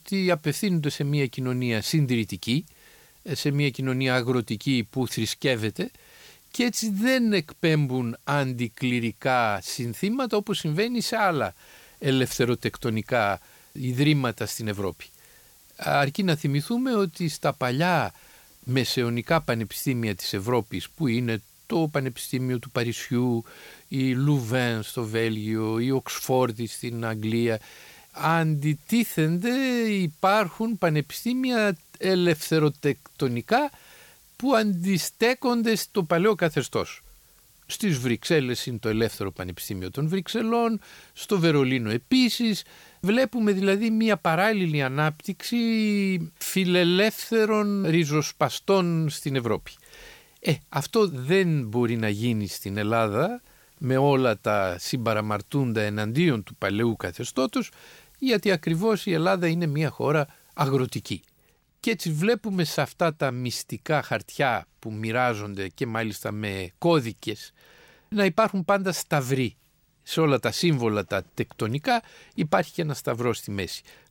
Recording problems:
hiss; faint; until 1:01; 30 dB below the speech

